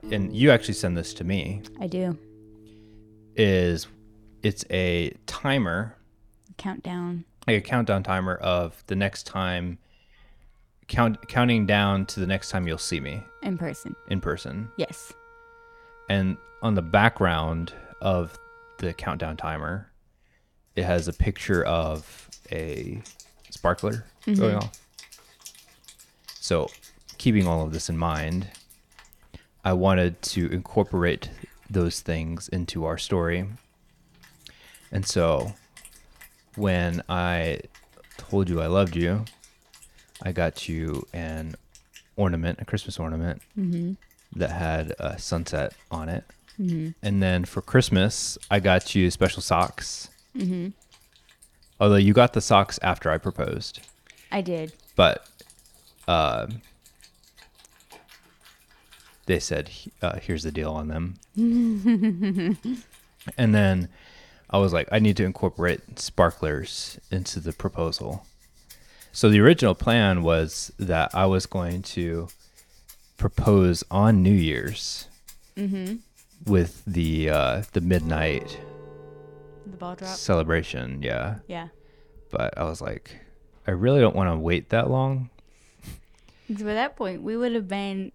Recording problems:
background music; faint; throughout; 25 dB below the speech

